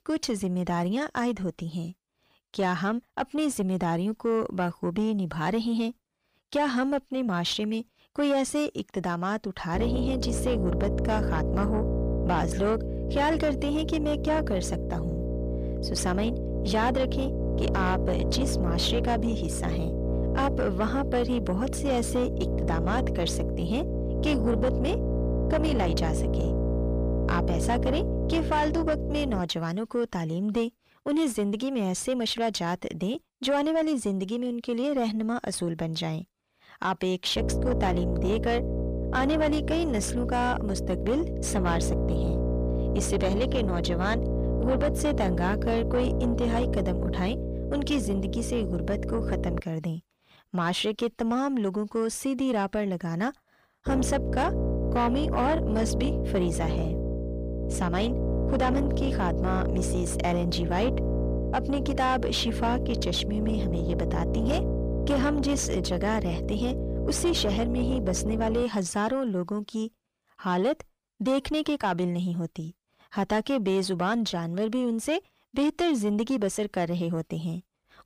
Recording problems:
distortion; slight; 10 dB below the speech
electrical hum; loud; from 9.5 to 29 s, from 37 to 50 s and from 54 s to 1:09; 60 Hz, 5 dB below the speech

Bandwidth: 15 kHz